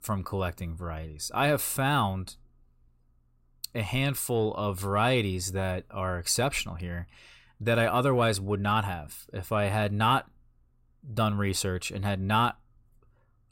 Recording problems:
none

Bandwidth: 16 kHz